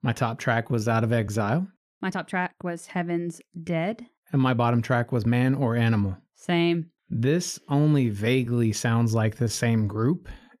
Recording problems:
uneven, jittery; strongly; from 0.5 to 9.5 s

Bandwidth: 14.5 kHz